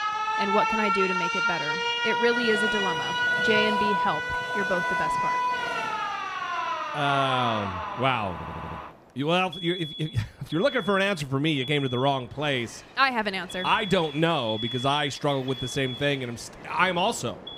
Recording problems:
alarms or sirens; loud; throughout; 1 dB below the speech
train or aircraft noise; noticeable; throughout; 15 dB below the speech
audio stuttering; at 8.5 s

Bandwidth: 15.5 kHz